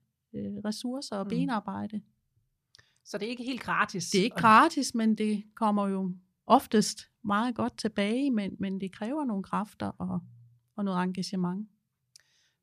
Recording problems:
none

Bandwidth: 14.5 kHz